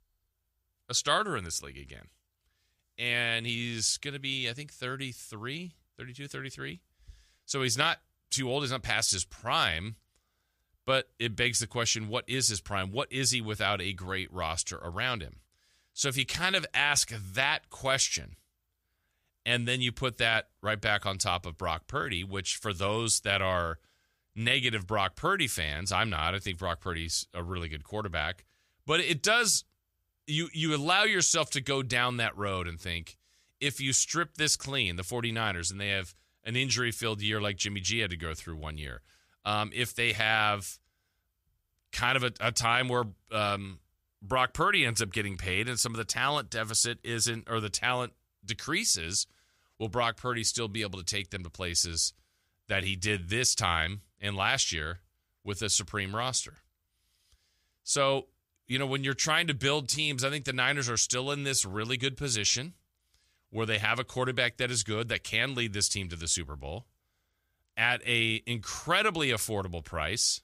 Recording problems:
none

